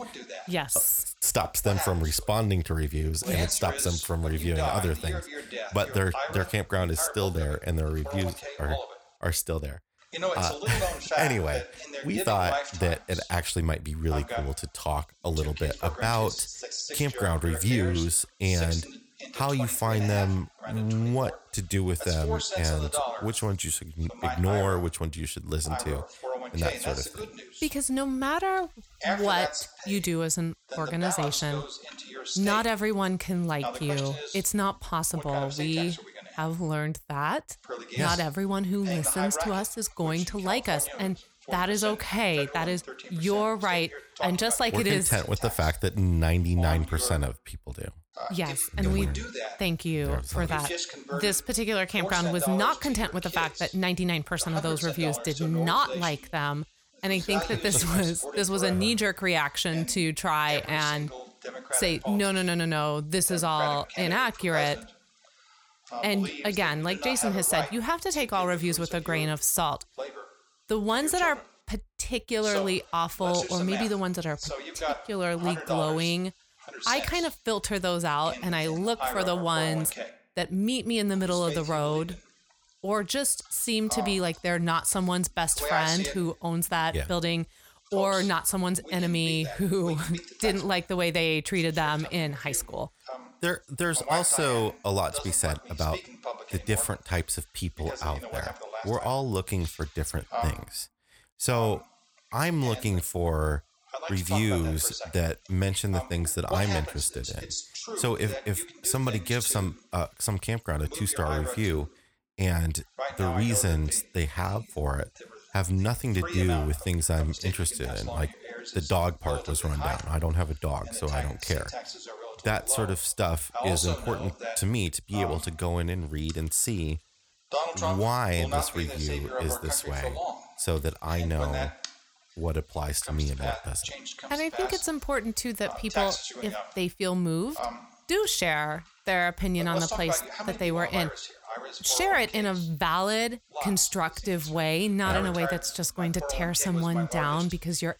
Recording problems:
voice in the background; loud; throughout; 8 dB below the speech

